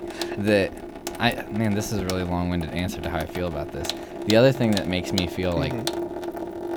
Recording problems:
household noises; loud; throughout; 8 dB below the speech

